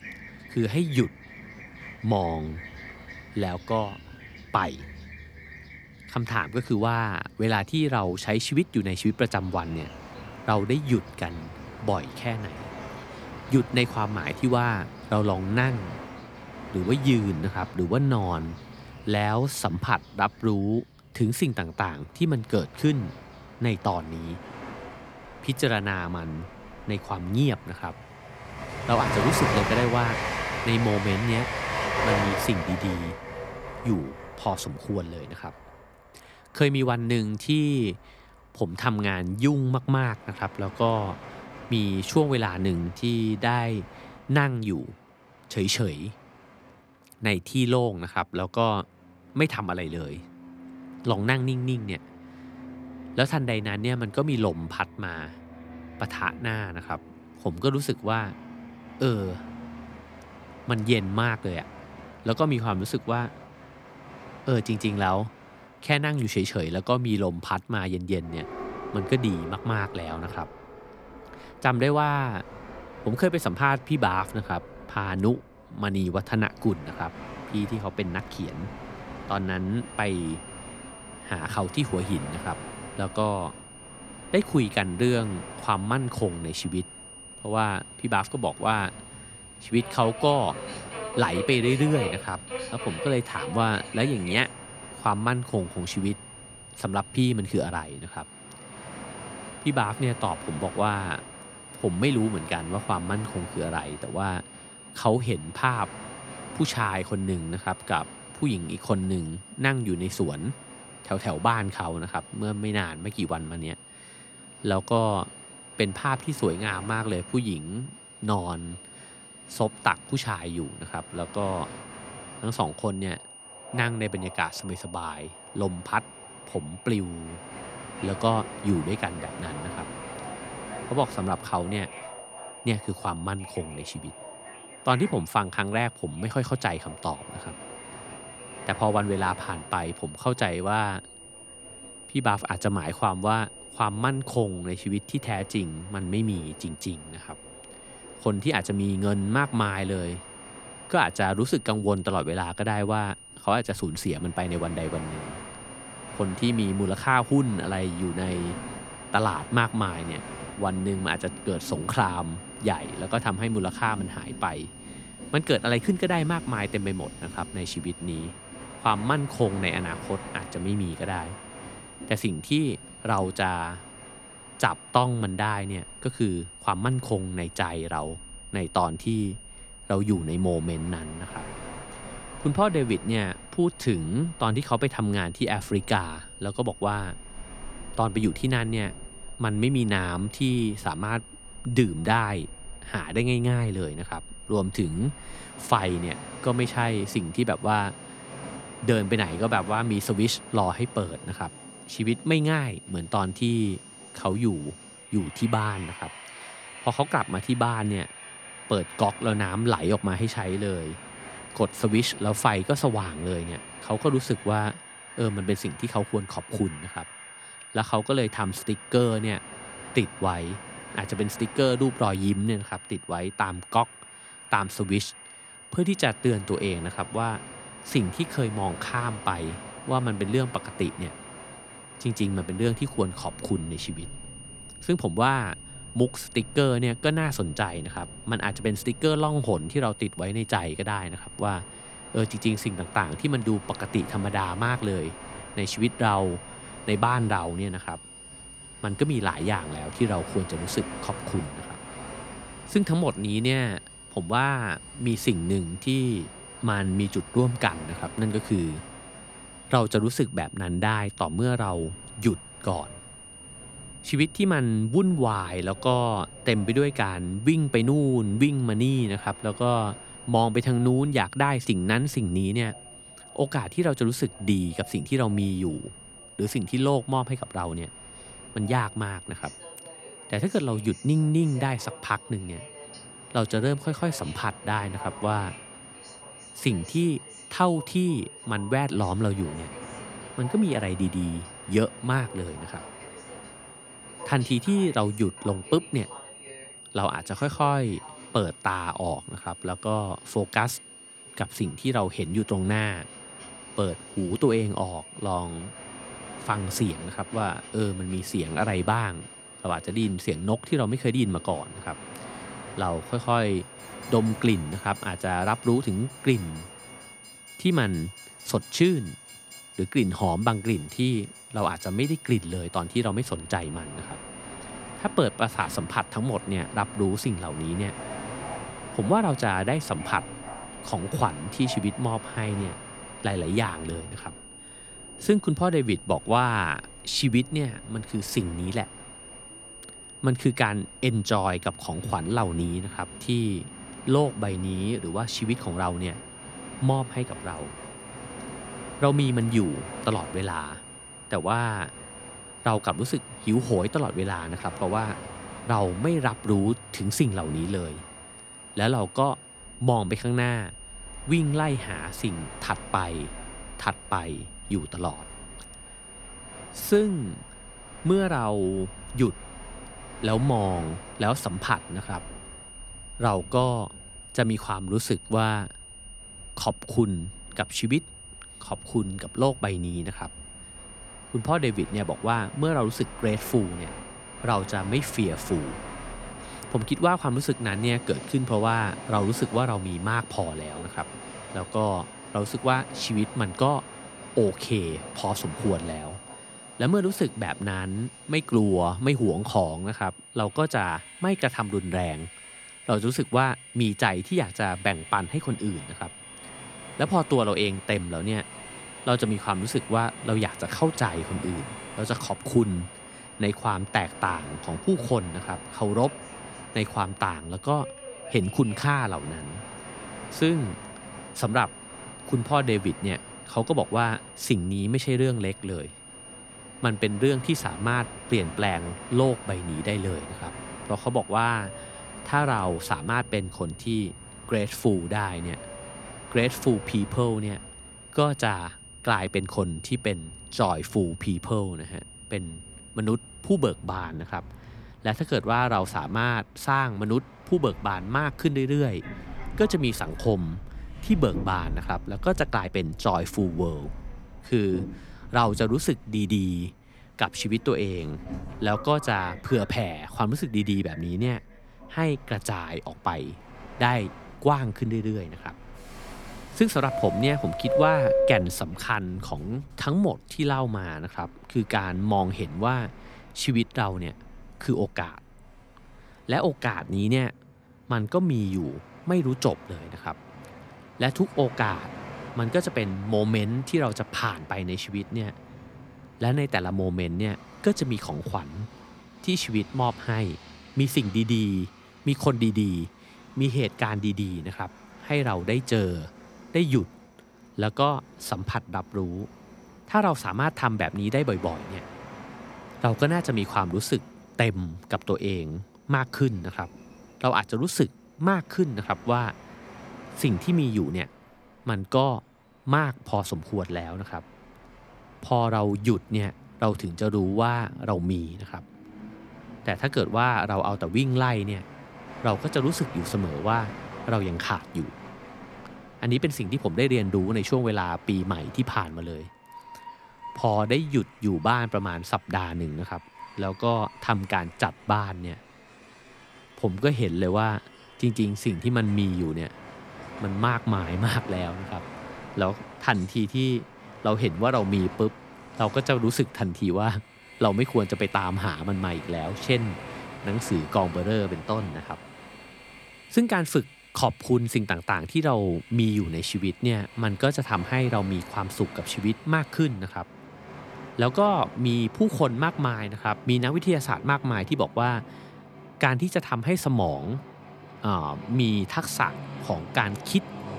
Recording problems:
high-pitched whine; noticeable; from 1:20 to 7:24; 9.5 kHz, 15 dB below the speech
train or aircraft noise; noticeable; throughout; 15 dB below the speech
uneven, jittery; slightly; from 2:57 to 7:35

